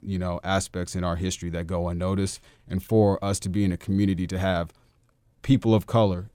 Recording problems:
none

